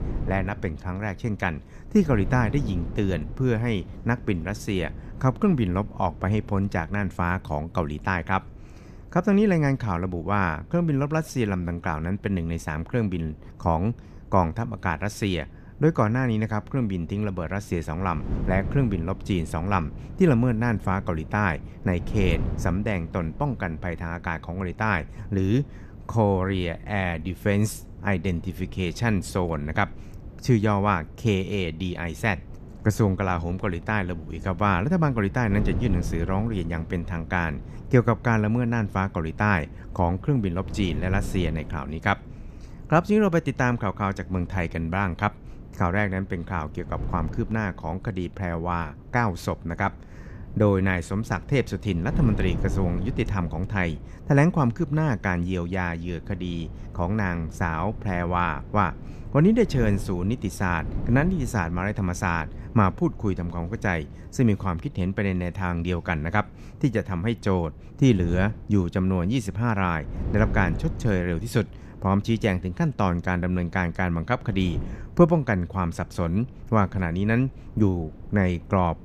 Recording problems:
wind noise on the microphone; occasional gusts; 20 dB below the speech

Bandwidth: 14.5 kHz